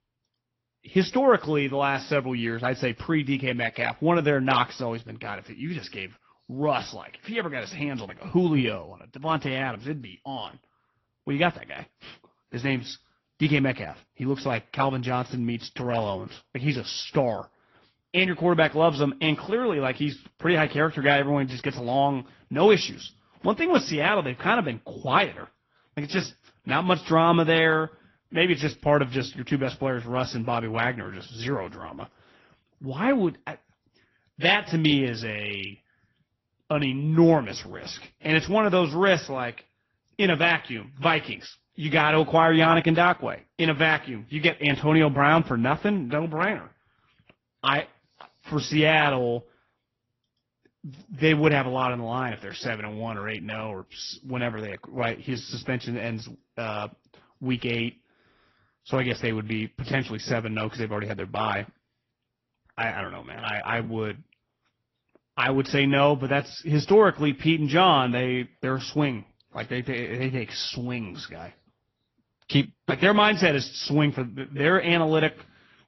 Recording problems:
high frequencies cut off; noticeable; nothing above 6 kHz
garbled, watery; slightly

